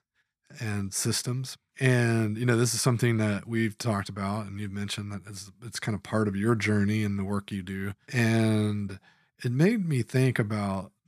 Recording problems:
none

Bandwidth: 14.5 kHz